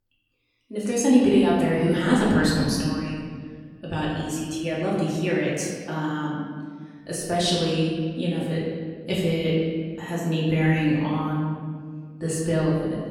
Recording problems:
off-mic speech; far
room echo; noticeable; dies away in 1.8 s

